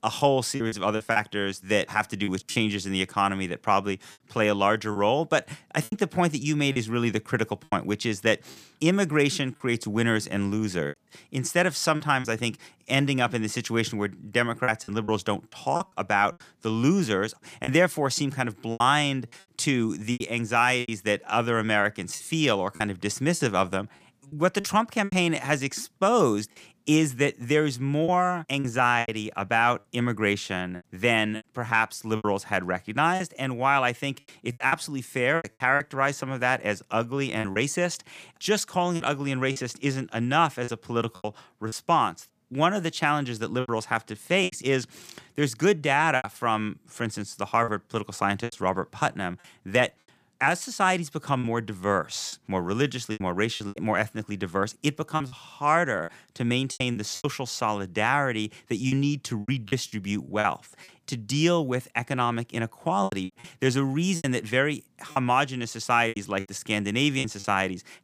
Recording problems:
choppy; very; 7% of the speech affected

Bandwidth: 15 kHz